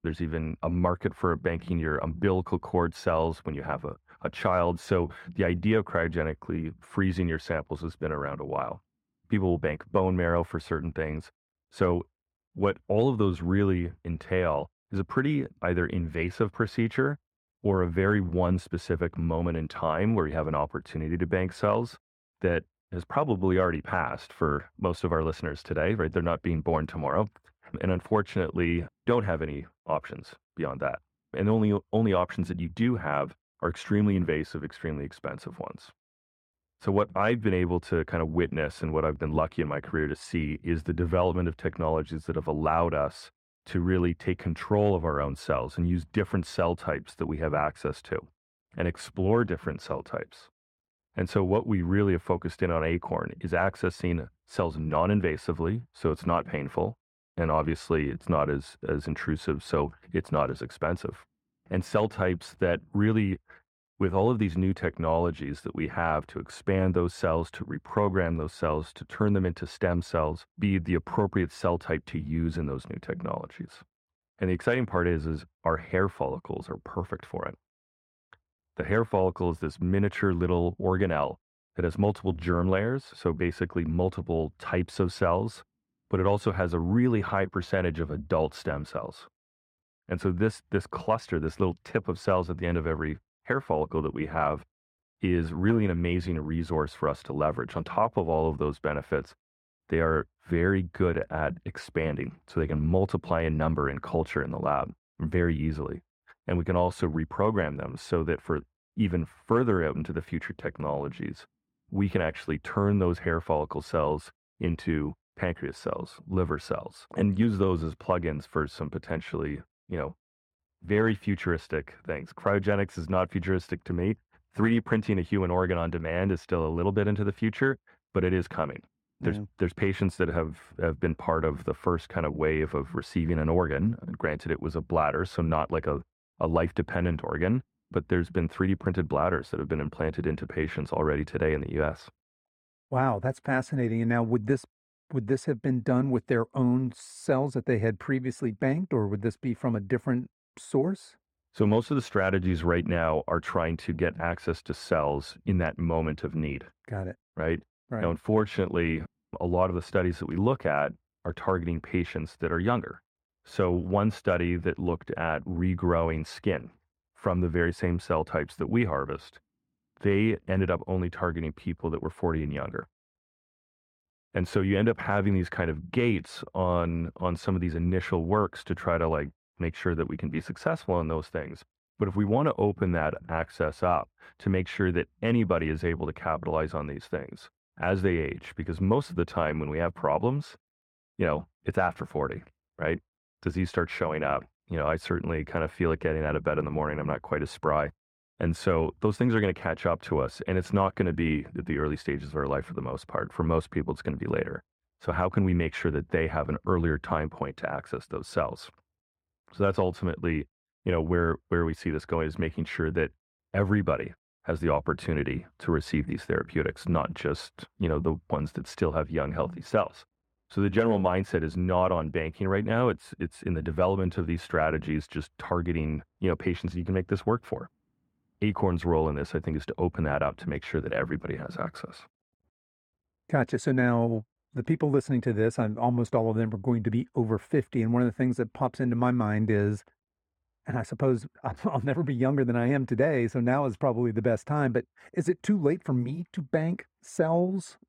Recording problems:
muffled; slightly; fading above 2.5 kHz

